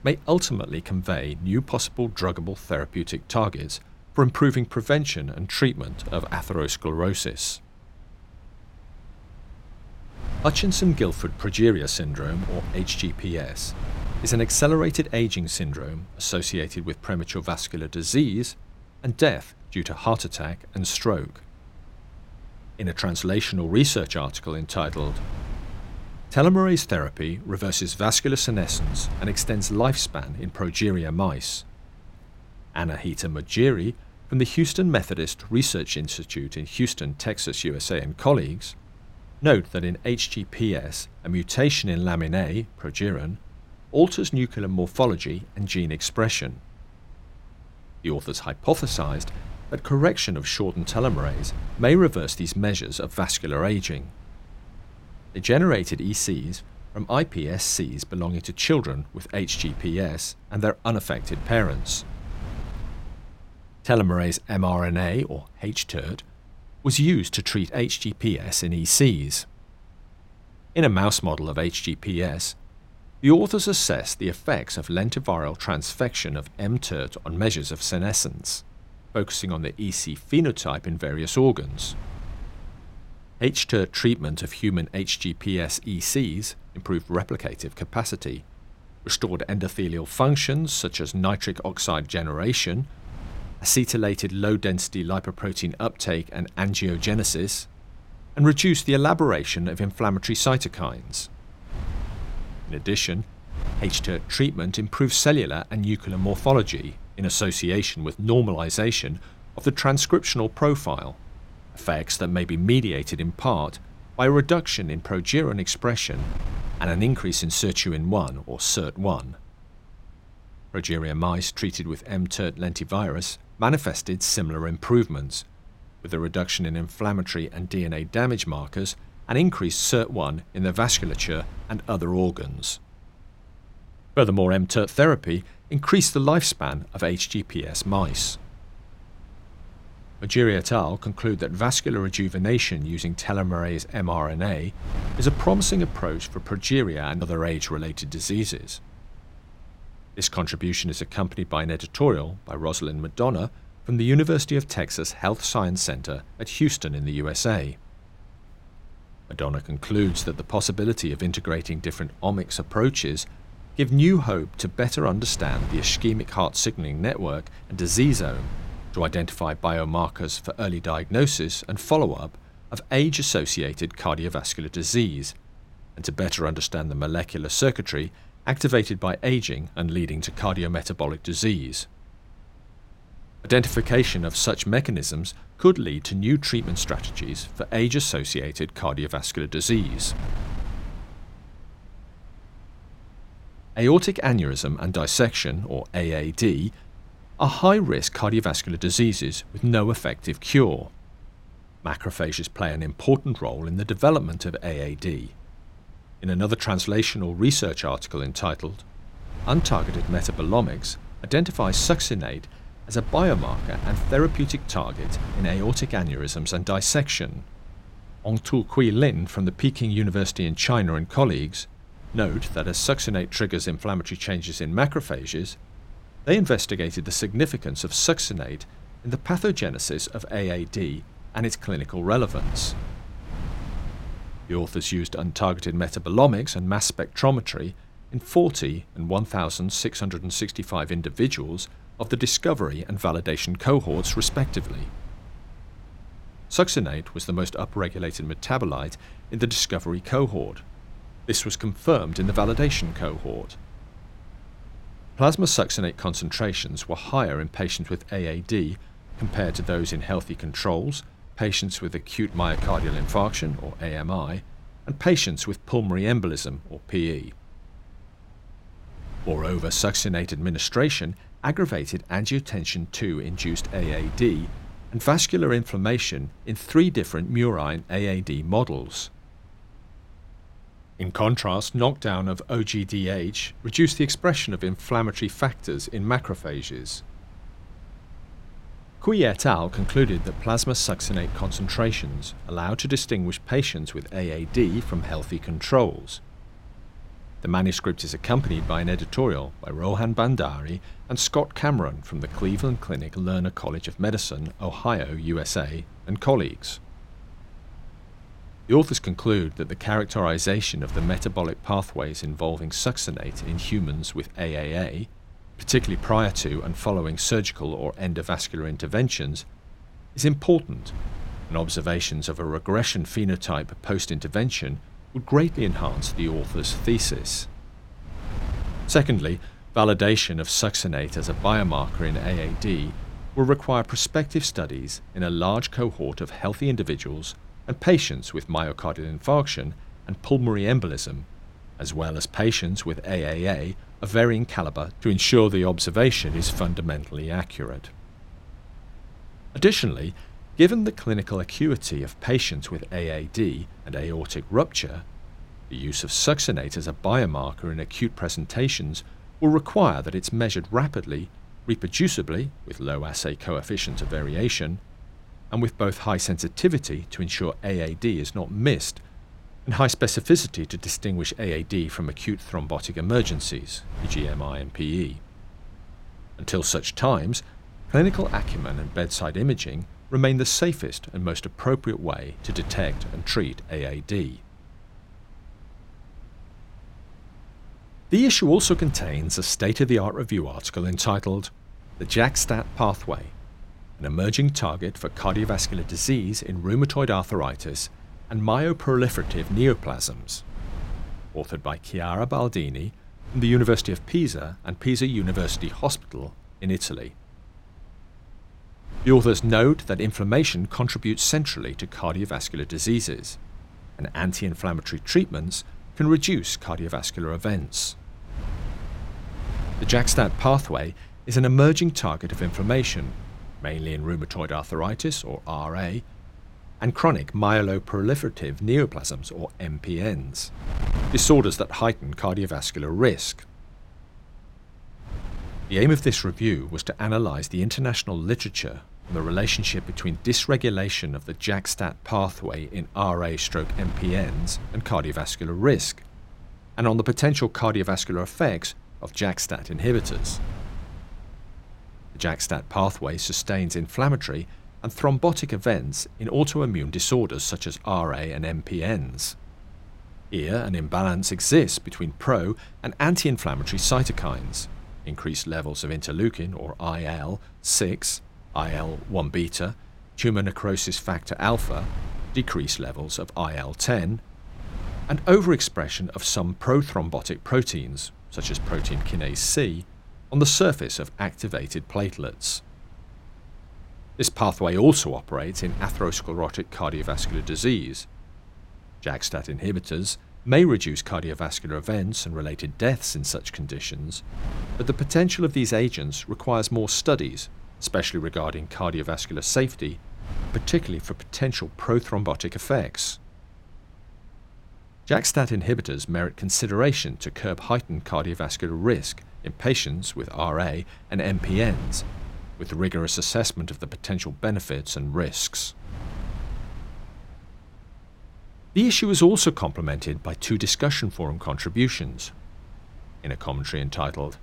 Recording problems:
wind noise on the microphone; occasional gusts; 25 dB below the speech
uneven, jittery; strongly; from 2:14 to 7:23

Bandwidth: 16 kHz